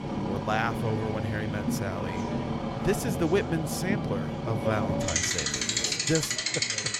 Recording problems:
traffic noise; very loud; throughout; 2 dB above the speech
chatter from many people; noticeable; throughout; 10 dB below the speech

